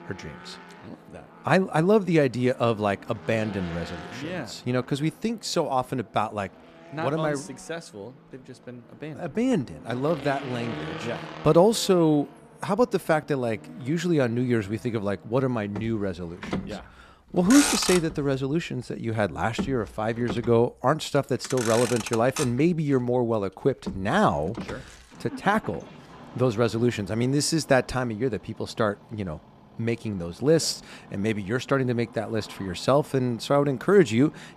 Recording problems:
traffic noise; noticeable; throughout; 10 dB below the speech

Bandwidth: 14.5 kHz